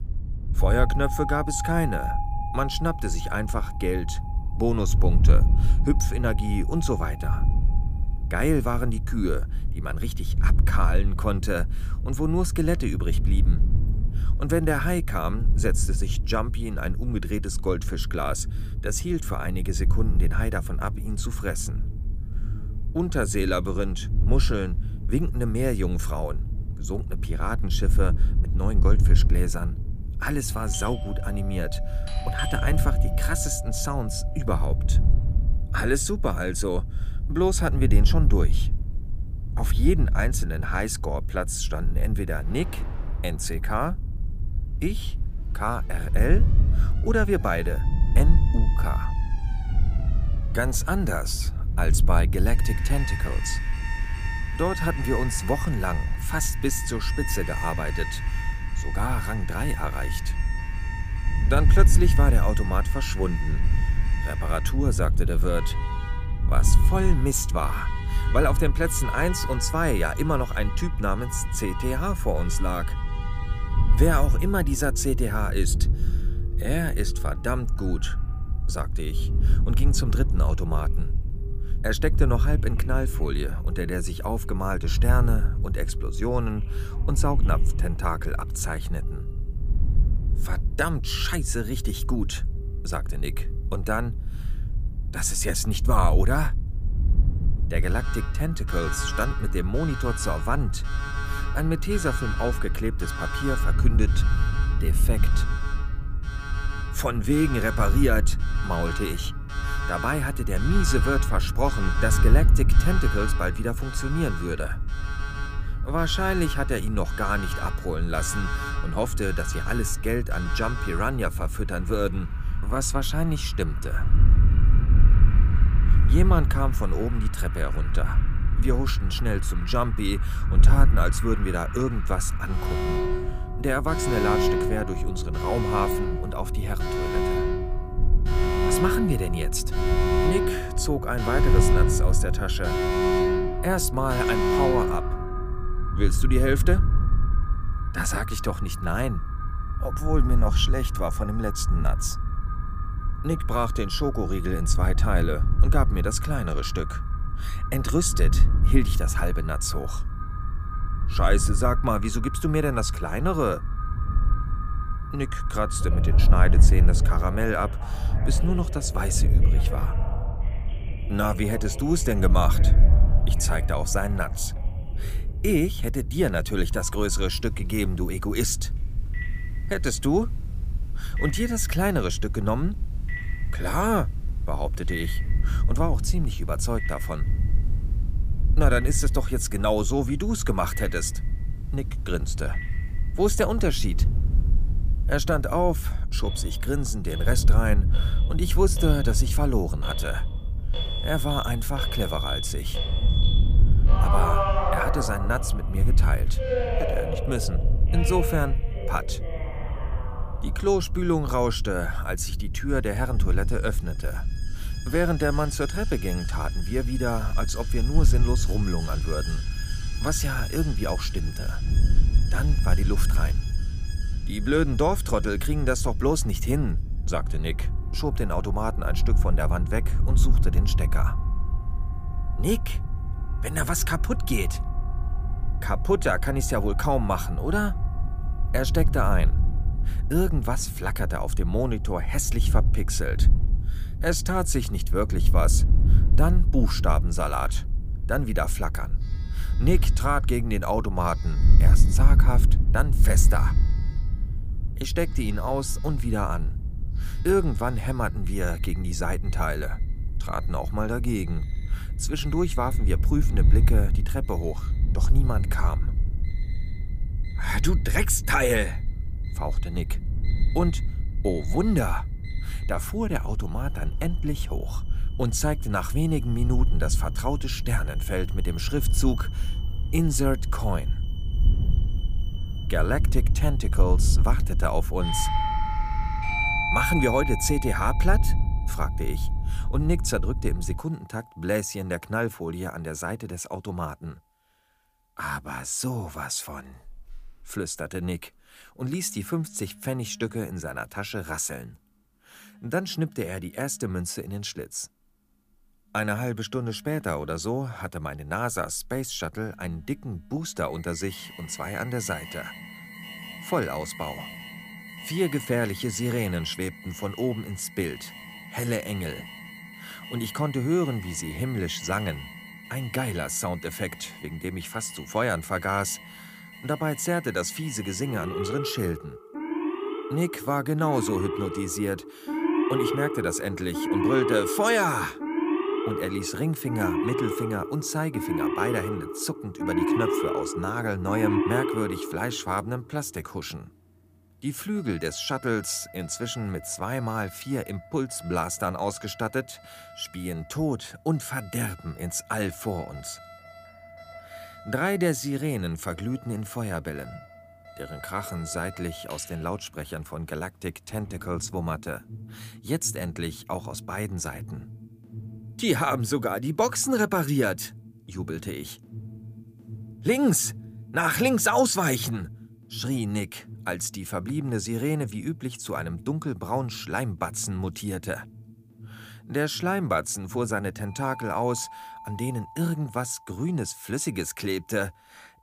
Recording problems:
alarms or sirens; loud; throughout; 7 dB below the speech
wind noise on the microphone; occasional gusts; until 4:51; 15 dB below the speech

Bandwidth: 15 kHz